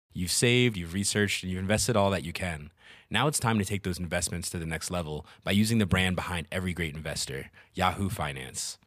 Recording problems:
none

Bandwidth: 15 kHz